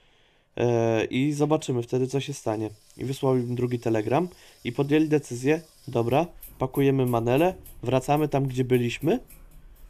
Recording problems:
household noises; faint; throughout; 25 dB below the speech

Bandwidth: 14.5 kHz